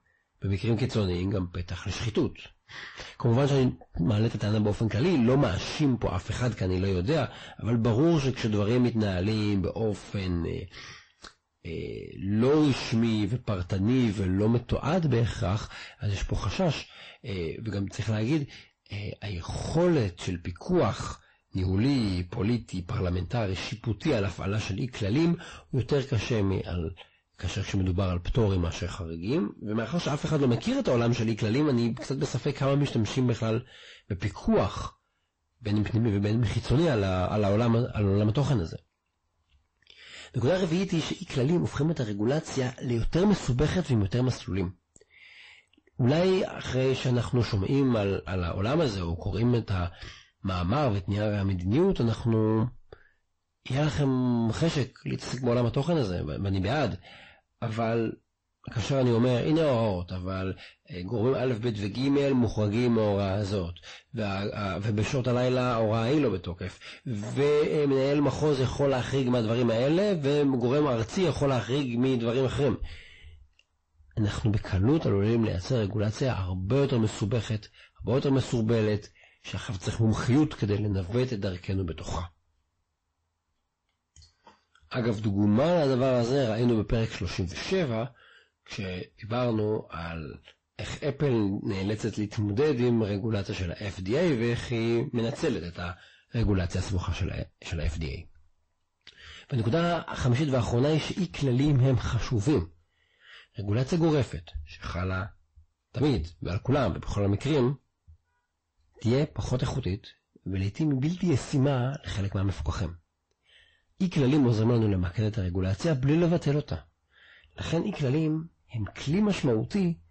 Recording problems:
distortion; heavy; 7 dB below the speech
garbled, watery; slightly; nothing above 8 kHz

